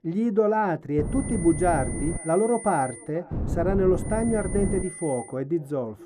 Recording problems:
muffled; slightly; fading above 1.5 kHz
echo of what is said; faint; from 1.5 s on; 480 ms later, 25 dB below the speech
high-pitched whine; noticeable; from 1 to 3 s and from 4 to 5.5 s; 9.5 kHz, 10 dB below the speech
wind noise on the microphone; occasional gusts; from 1 to 2 s and from 3.5 to 5 s; 15 dB below the speech

